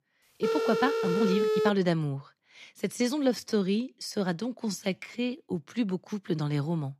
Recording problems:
phone ringing; loud; until 1.5 s; peak 3 dB above the speech
uneven, jittery; strongly; from 1 to 5.5 s

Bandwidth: 14.5 kHz